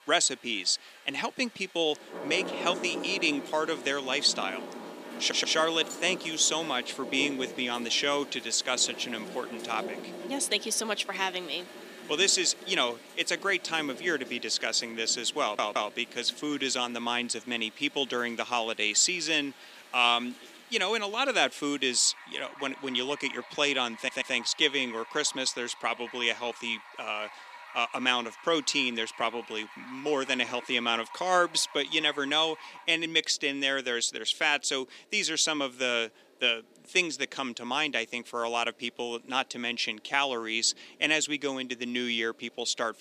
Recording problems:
thin; somewhat; fading below 300 Hz
rain or running water; noticeable; throughout; 15 dB below the speech
audio stuttering; at 5 s, at 15 s and at 24 s

